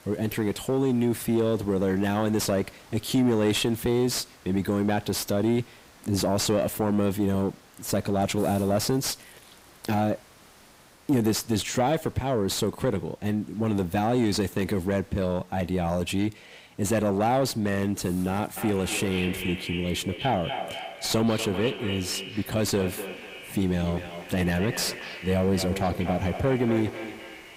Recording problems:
echo of what is said; strong; from 19 s on; 240 ms later, 9 dB below the speech
distortion; slight; 10 dB below the speech
hiss; faint; throughout; 25 dB below the speech

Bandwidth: 15.5 kHz